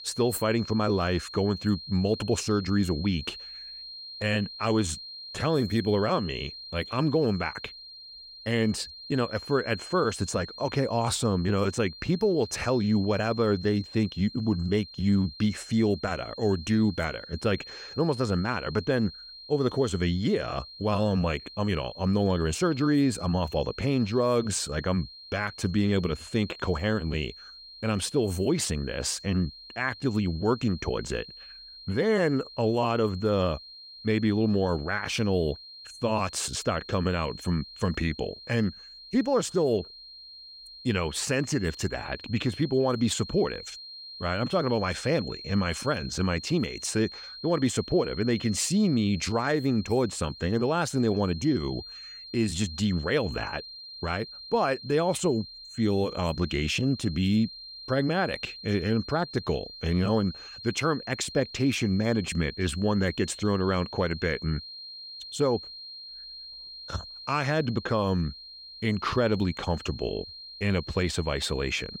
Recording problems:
high-pitched whine; noticeable; throughout; 4 kHz, 15 dB below the speech

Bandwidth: 16 kHz